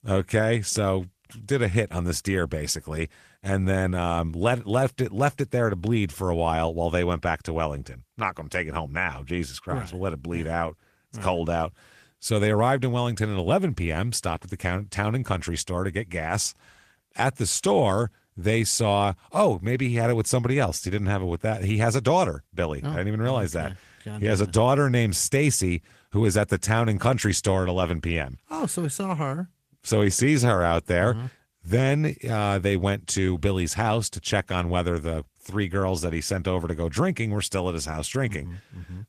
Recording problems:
garbled, watery; slightly; nothing above 14.5 kHz

